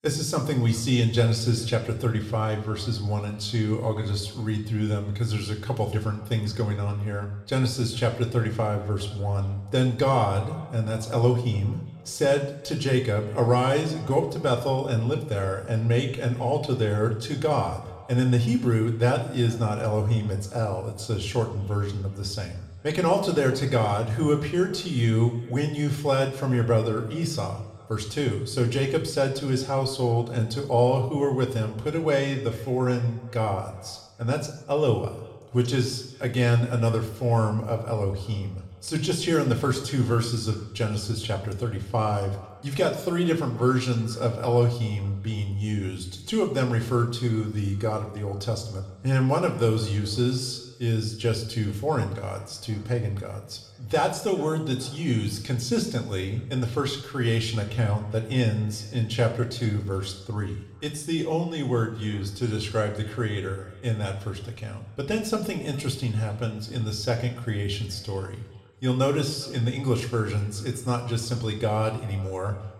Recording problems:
echo of what is said; faint; throughout; 410 ms later, 25 dB below the speech
room echo; slight; dies away in 0.7 s
off-mic speech; somewhat distant

